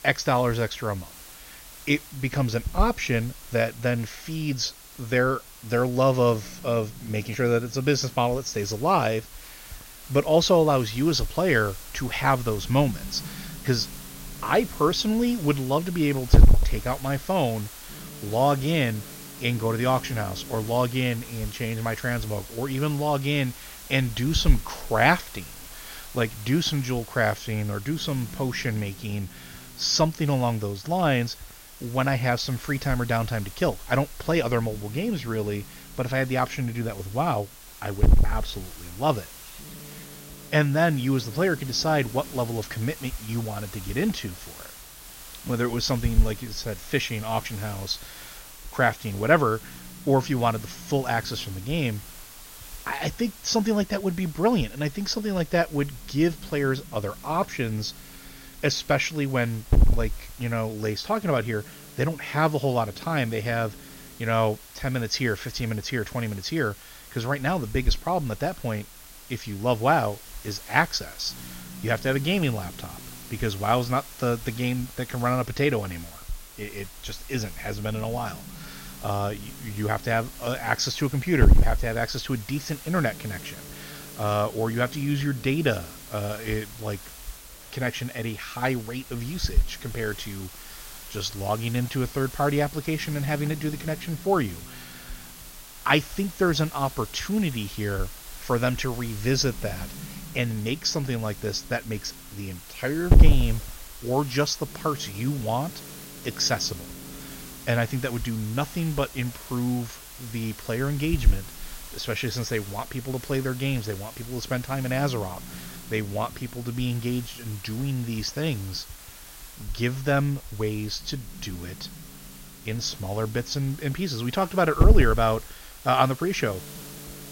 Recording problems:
high frequencies cut off; noticeable; nothing above 6.5 kHz
hiss; loud; throughout; 8 dB below the speech

